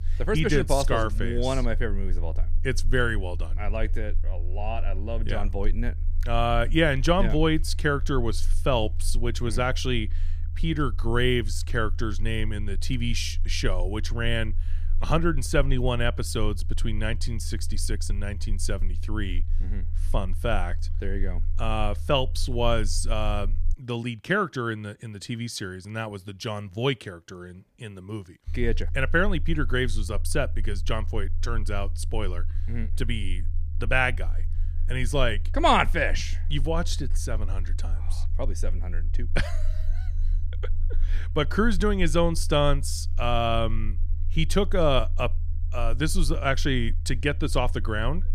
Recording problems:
low rumble; faint; until 24 s and from 28 s on; 25 dB below the speech

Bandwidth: 15 kHz